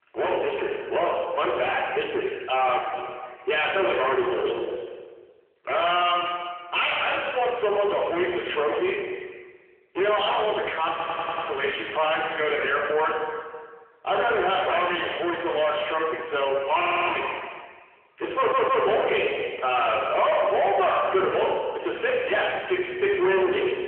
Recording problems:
distortion; heavy; 7 dB below the speech
room echo; noticeable; dies away in 1.1 s
phone-call audio; nothing above 3 kHz
off-mic speech; somewhat distant
audio stuttering; at 11 s, at 17 s and at 18 s

